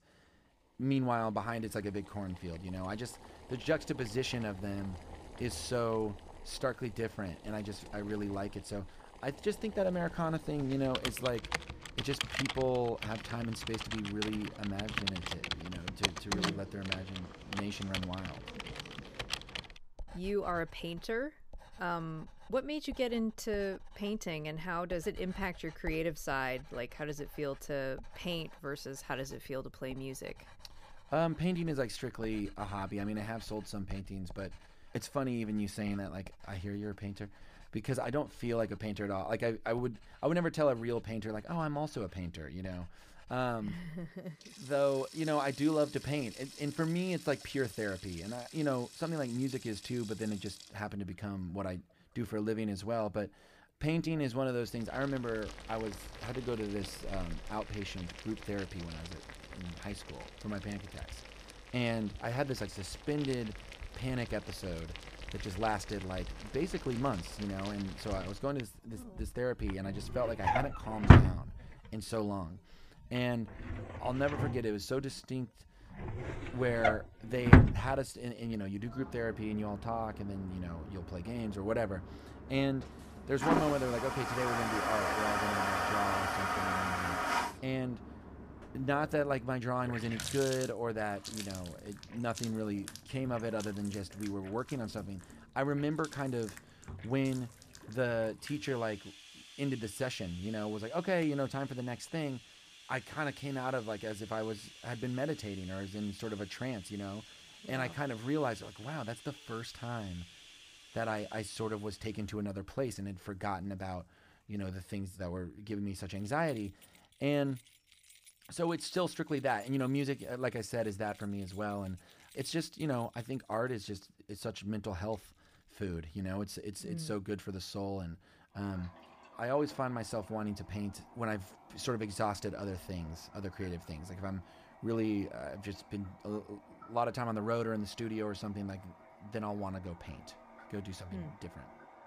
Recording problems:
household noises; very loud; throughout; as loud as the speech

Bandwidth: 15 kHz